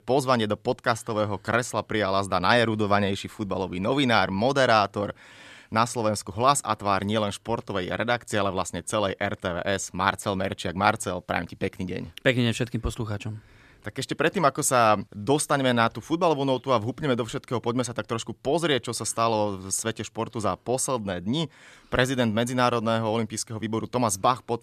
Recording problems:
none

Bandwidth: 14 kHz